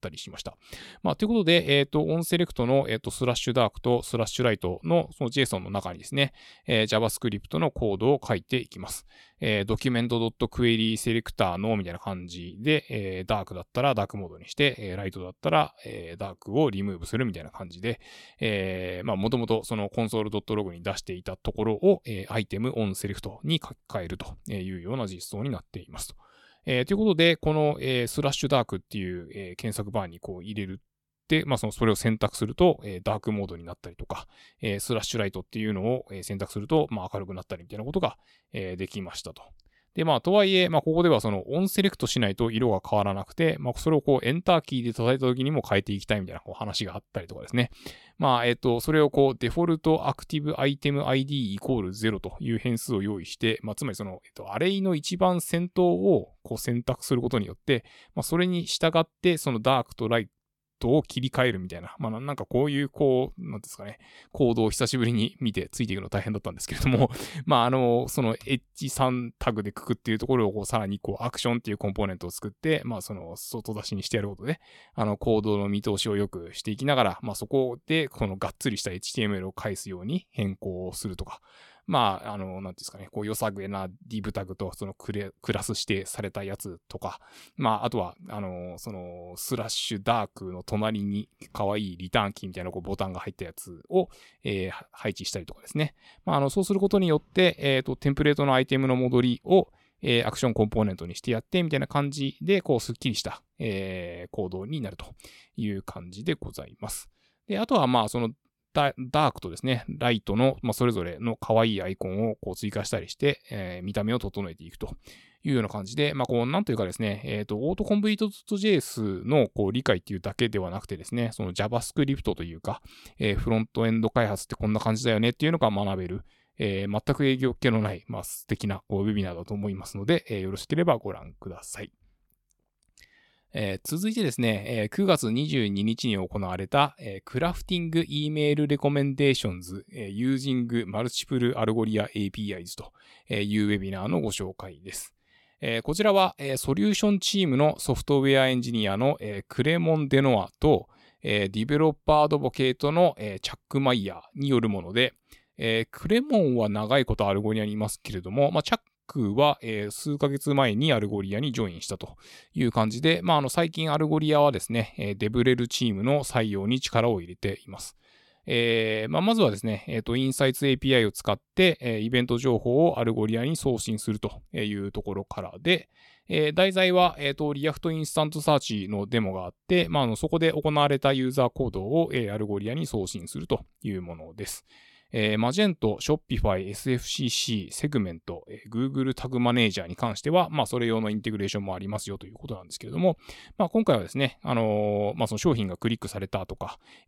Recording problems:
none

